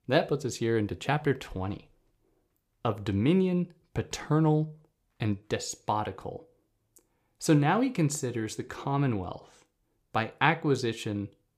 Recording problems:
none

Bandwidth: 15 kHz